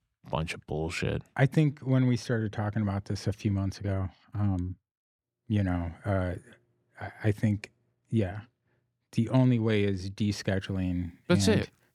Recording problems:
none

